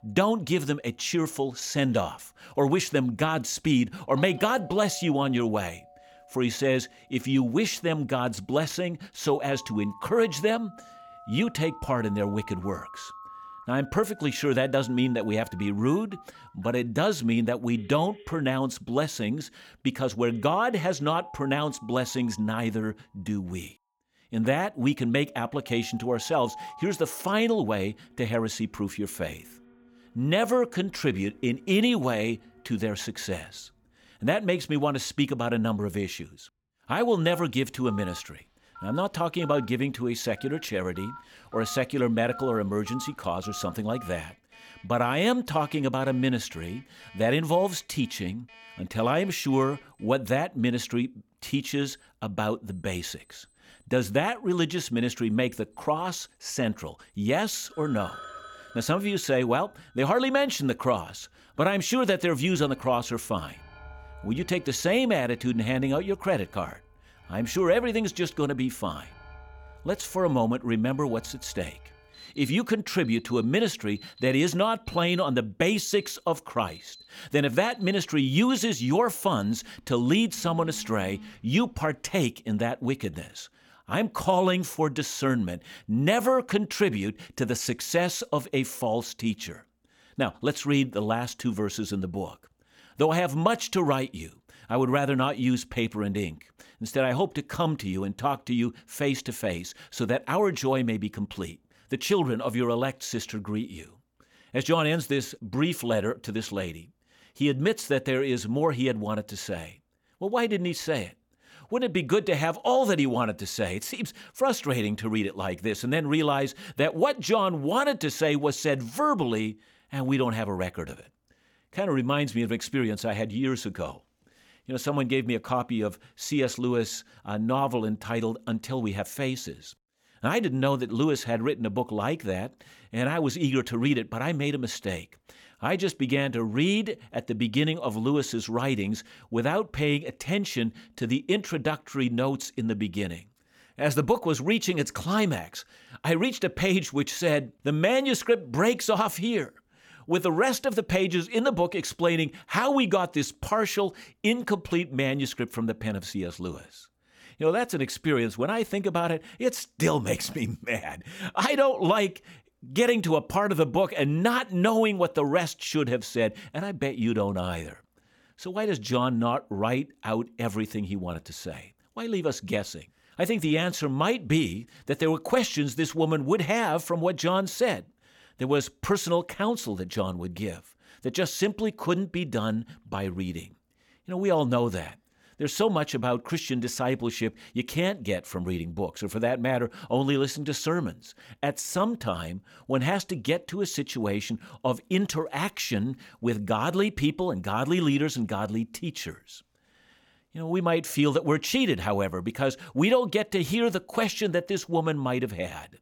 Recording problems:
alarms or sirens; faint; until 1:22; 20 dB below the speech

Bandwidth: 17.5 kHz